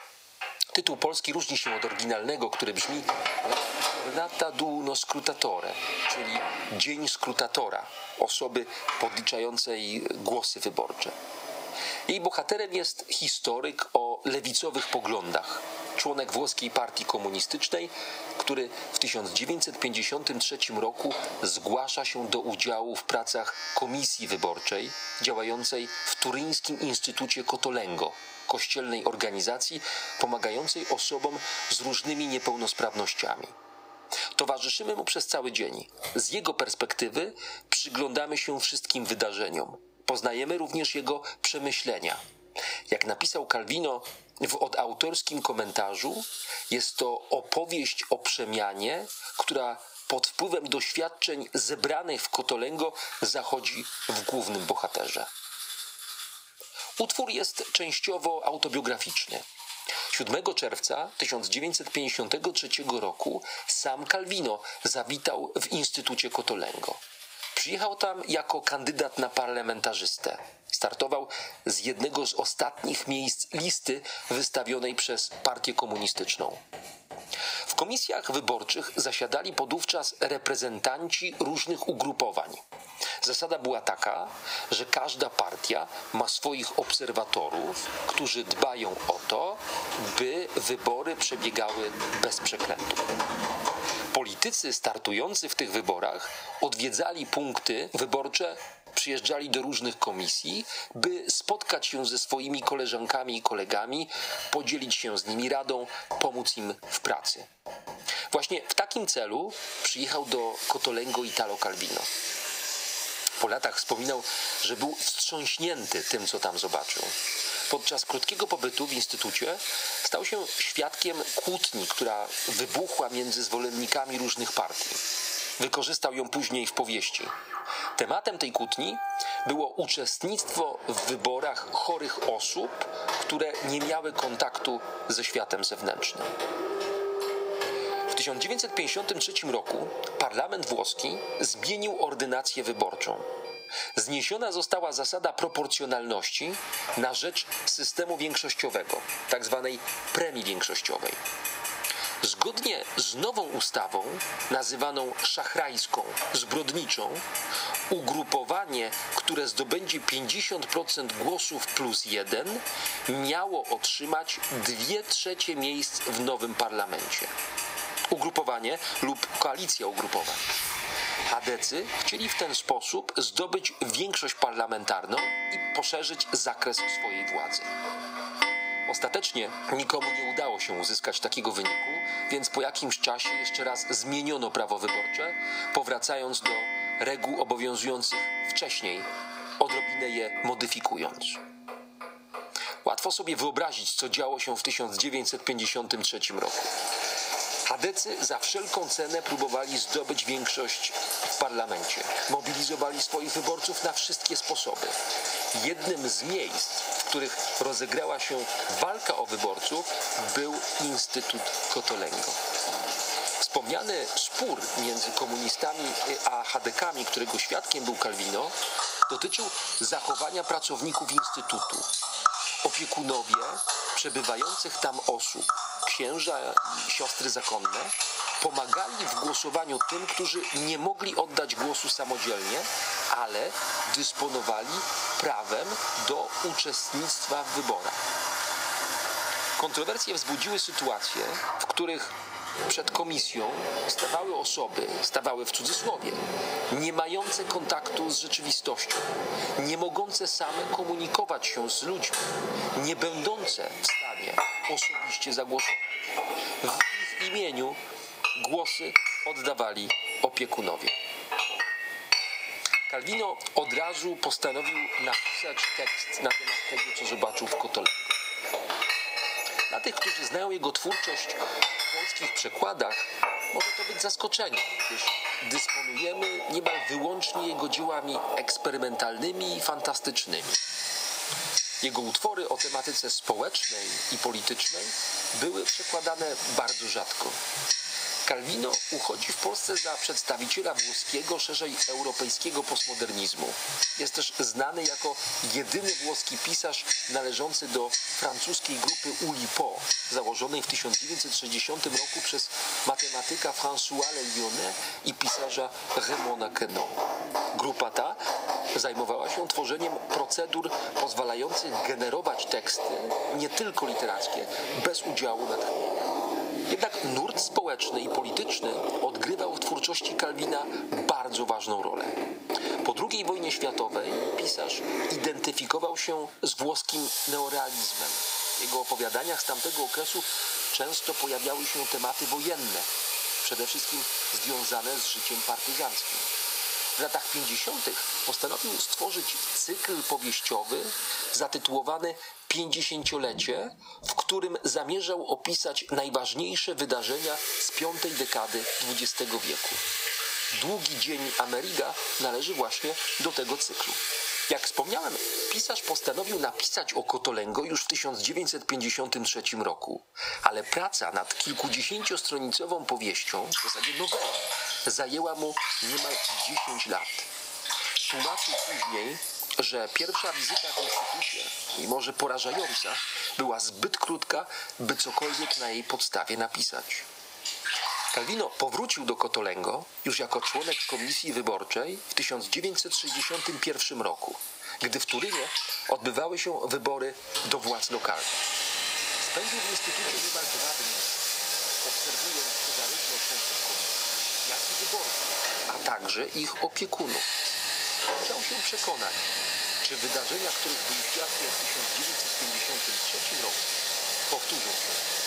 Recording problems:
thin; somewhat; fading below 650 Hz
squashed, flat; somewhat, background pumping
household noises; loud; throughout; 1 dB below the speech

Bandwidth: 15.5 kHz